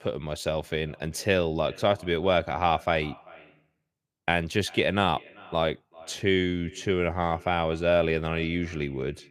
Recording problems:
echo of what is said; faint; throughout; 390 ms later, 25 dB below the speech

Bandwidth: 15 kHz